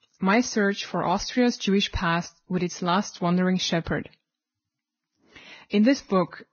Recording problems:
garbled, watery; badly; nothing above 6.5 kHz

